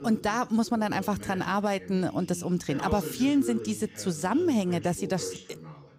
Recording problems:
voice in the background; noticeable; throughout; 10 dB below the speech

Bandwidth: 15.5 kHz